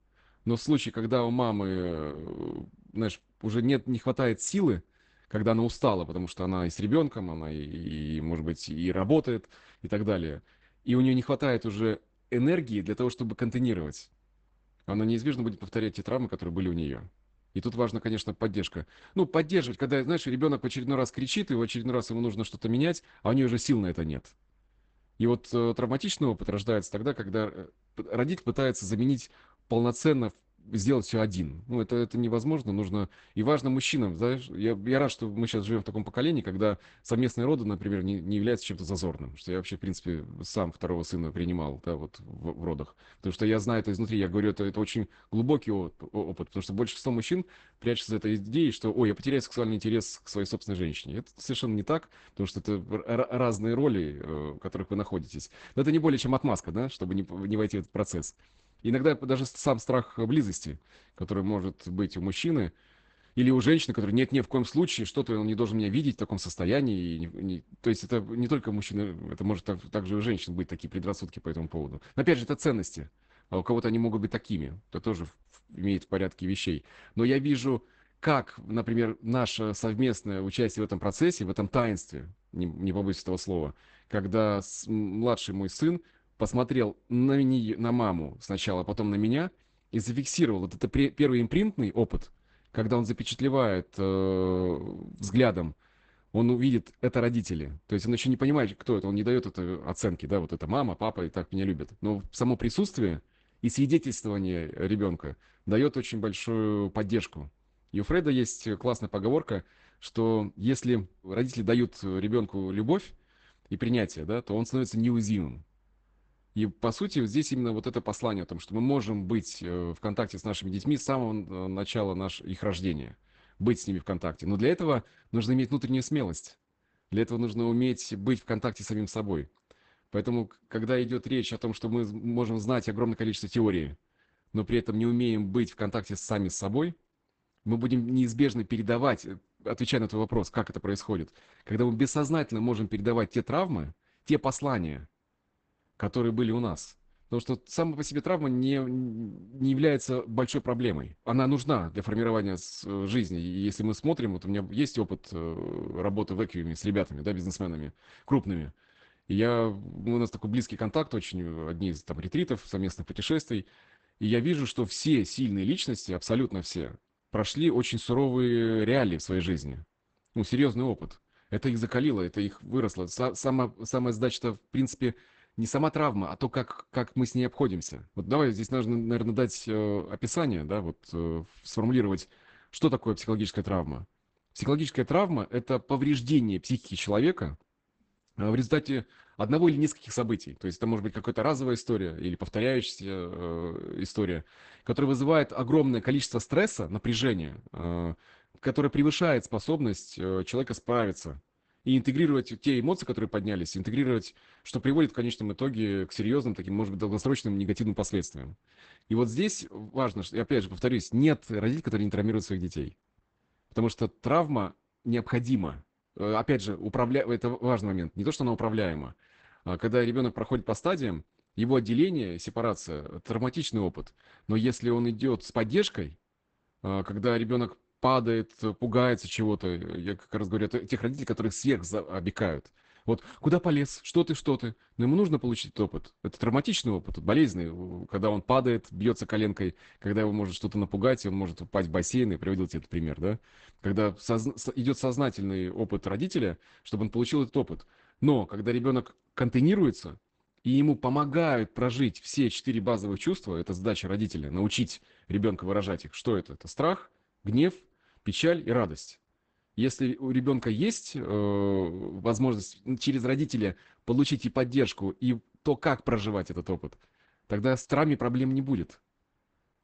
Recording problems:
garbled, watery; badly; nothing above 8 kHz

